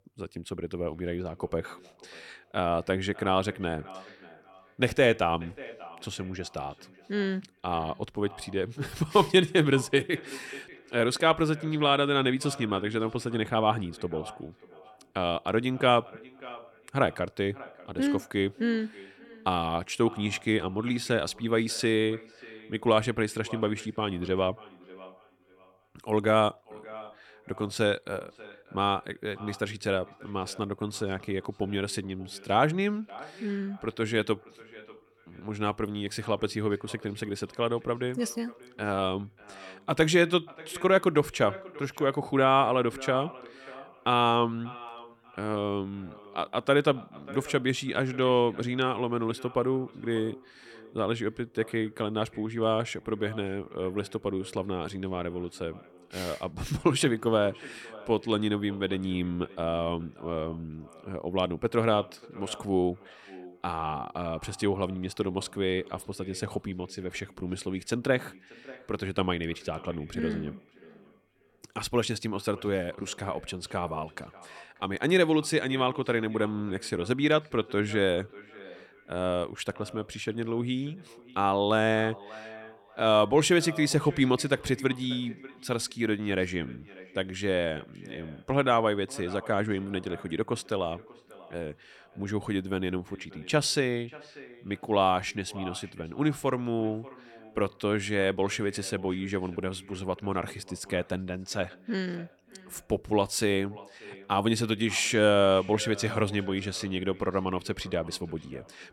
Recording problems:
echo of what is said; faint; throughout; 590 ms later, 20 dB below the speech

